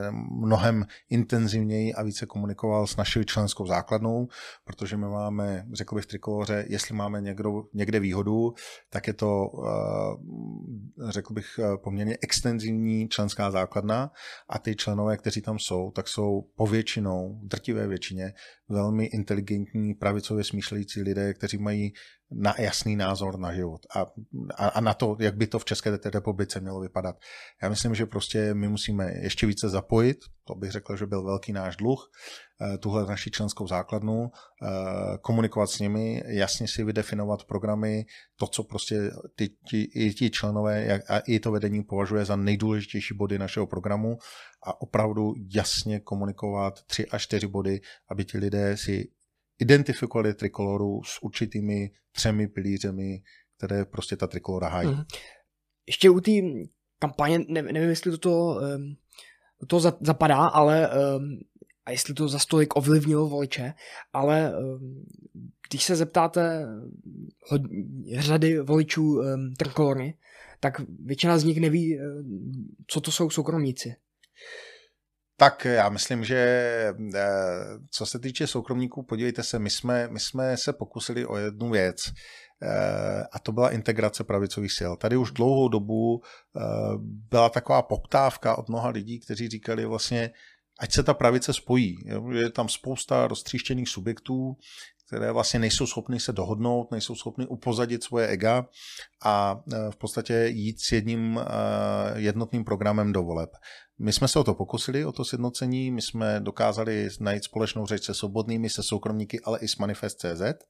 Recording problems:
abrupt cut into speech; at the start

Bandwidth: 15 kHz